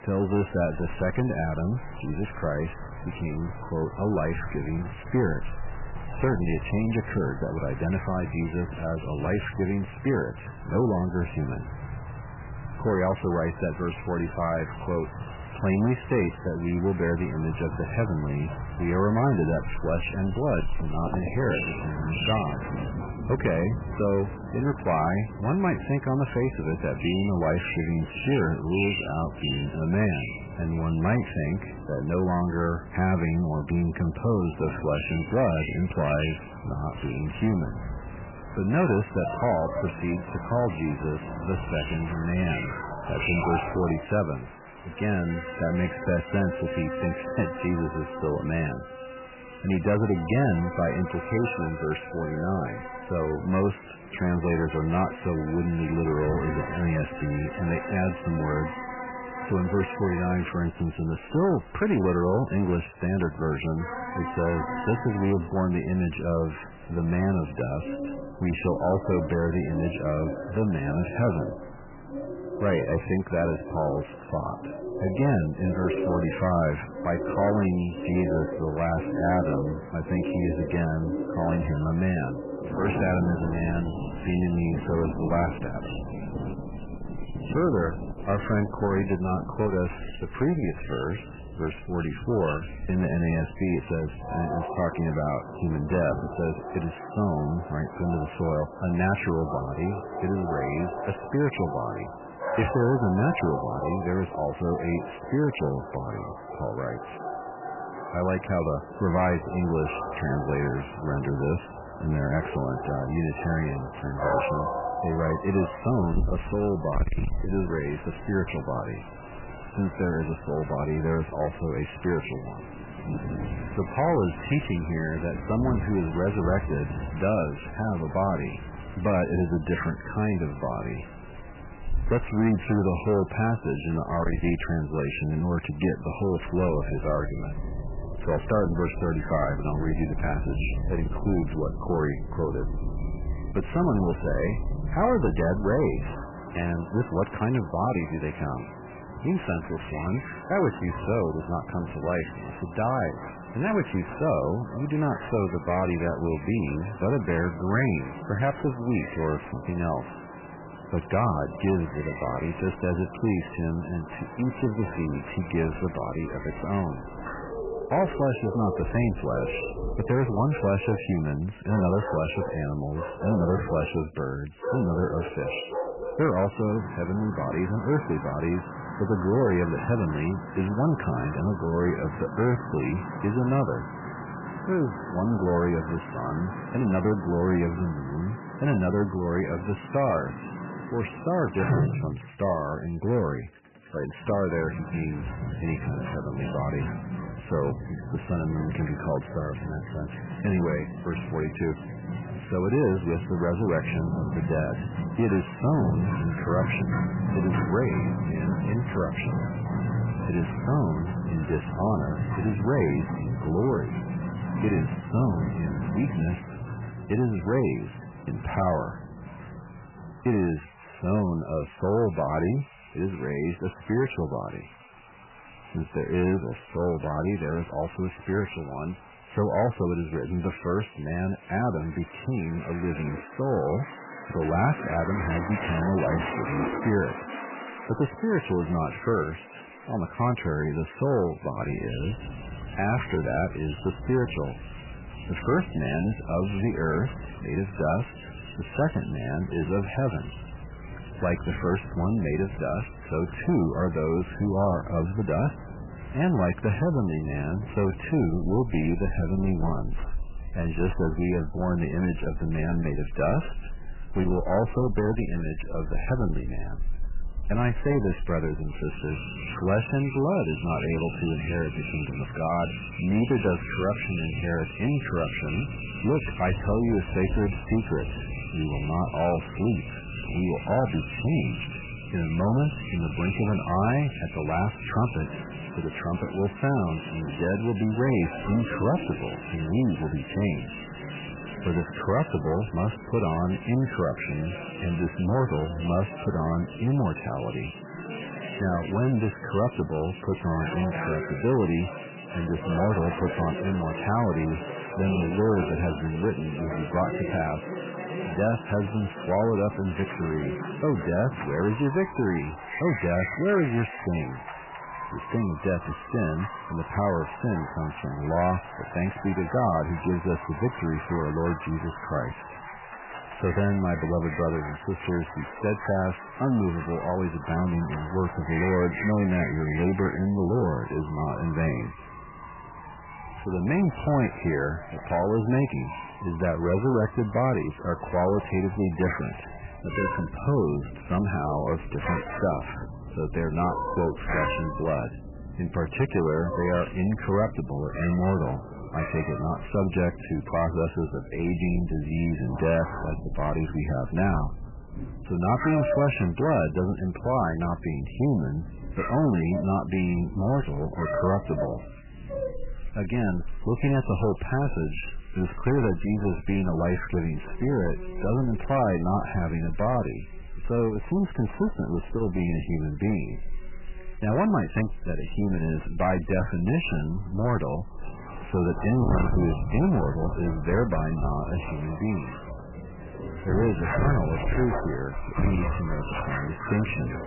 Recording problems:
garbled, watery; badly; nothing above 3 kHz
distortion; slight; 10 dB below the speech
animal sounds; loud; throughout; 8 dB below the speech
rain or running water; noticeable; throughout; 15 dB below the speech

